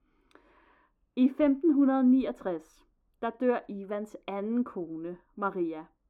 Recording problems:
muffled; very; fading above 2.5 kHz

